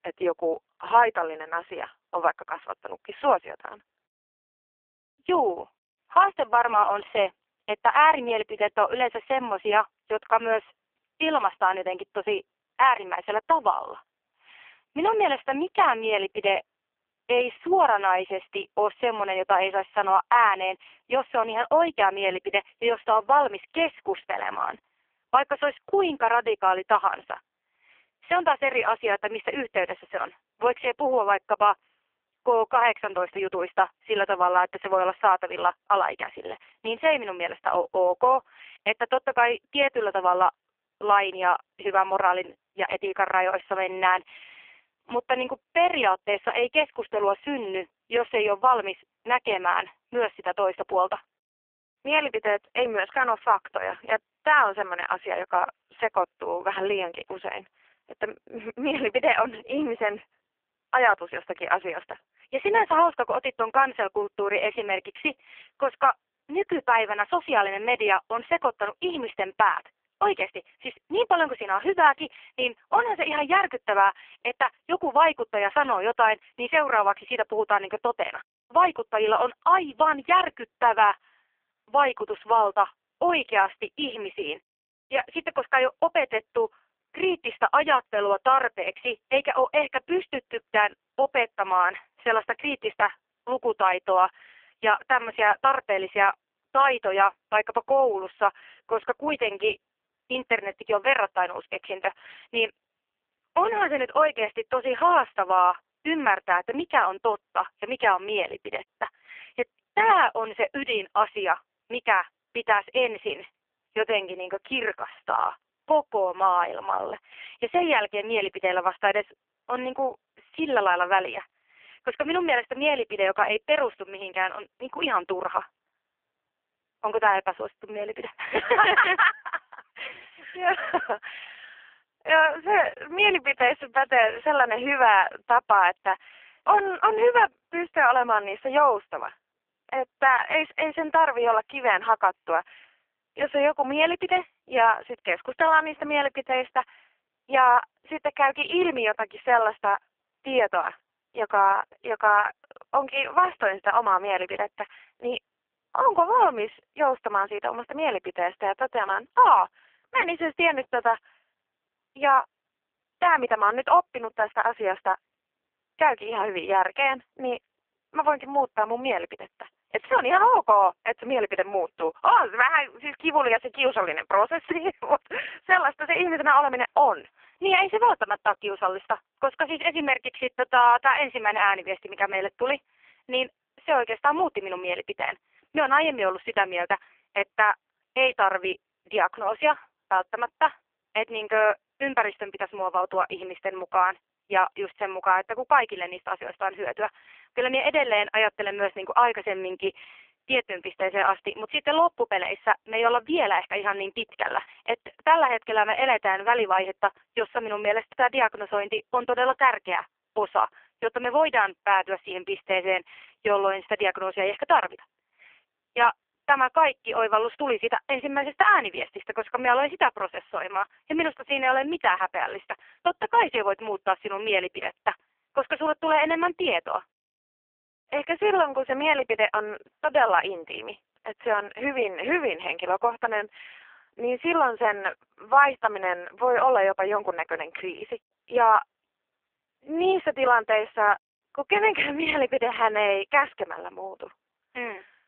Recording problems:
phone-call audio; poor line; nothing above 3 kHz

